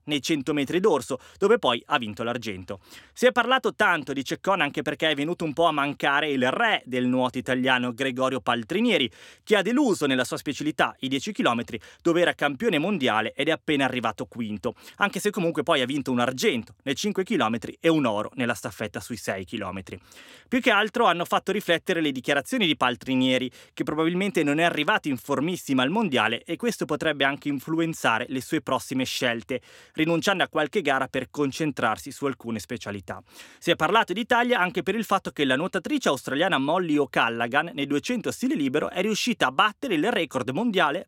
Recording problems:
none

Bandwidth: 16.5 kHz